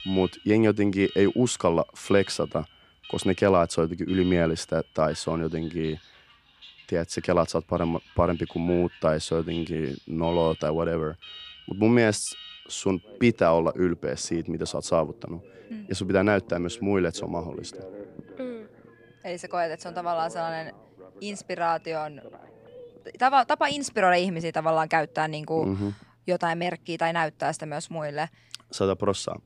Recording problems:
alarms or sirens; faint; throughout; 20 dB below the speech

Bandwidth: 15 kHz